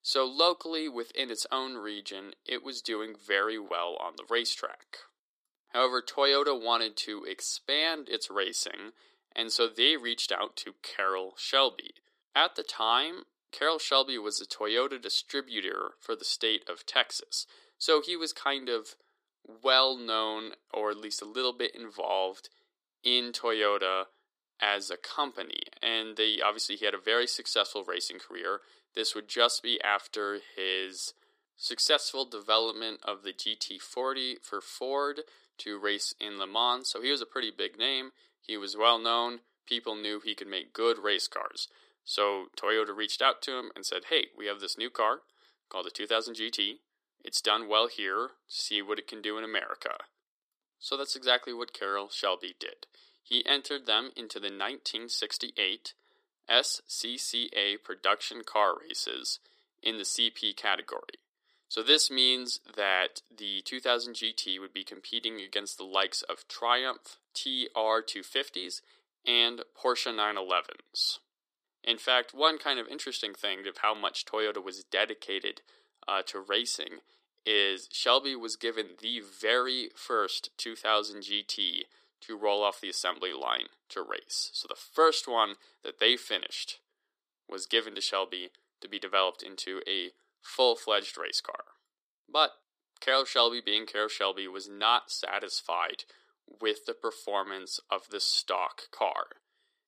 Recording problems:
thin; somewhat; fading below 300 Hz

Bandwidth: 14.5 kHz